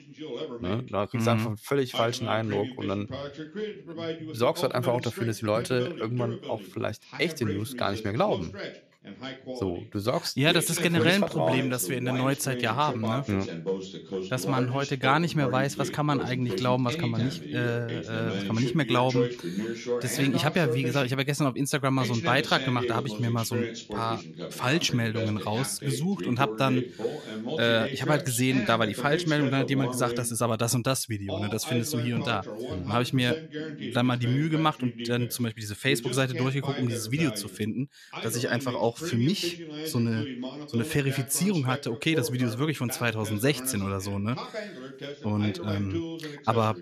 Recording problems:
voice in the background; loud; throughout; 8 dB below the speech

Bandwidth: 14 kHz